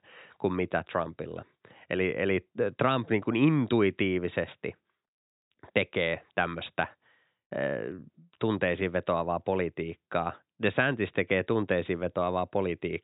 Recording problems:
high frequencies cut off; severe; nothing above 4 kHz

